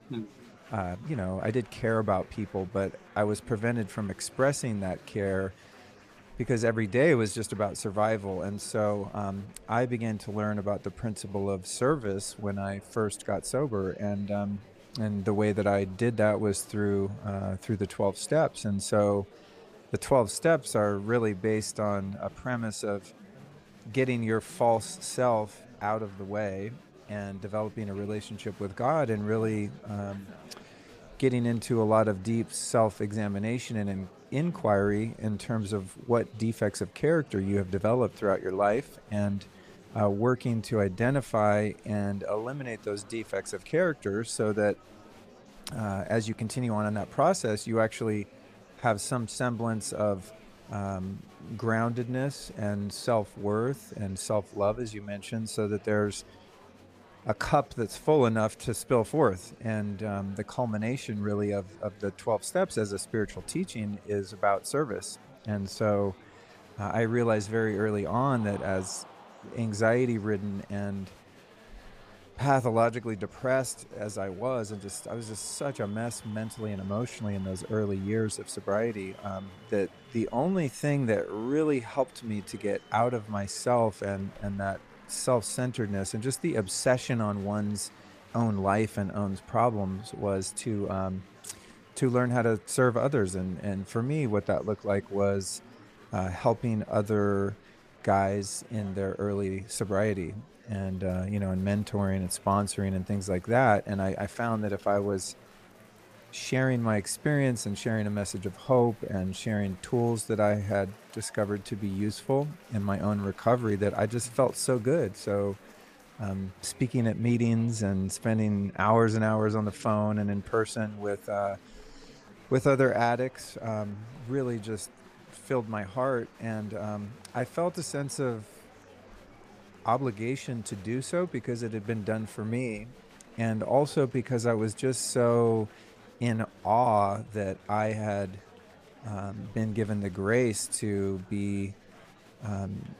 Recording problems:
murmuring crowd; faint; throughout; 25 dB below the speech

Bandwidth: 15 kHz